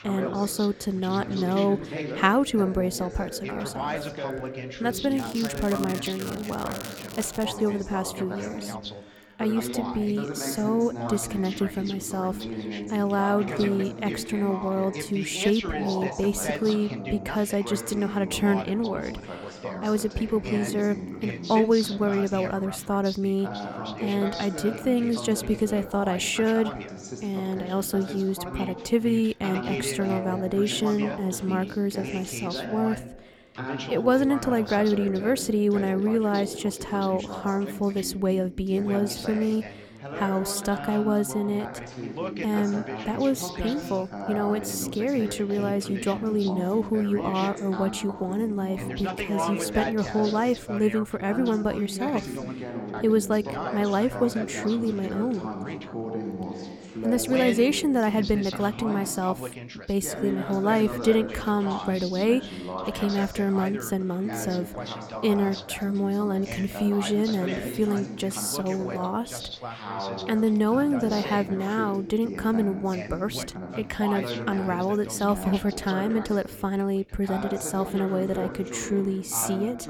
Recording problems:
background chatter; loud; throughout; 2 voices, 8 dB below the speech
crackling; noticeable; from 5 to 7.5 s; 15 dB below the speech

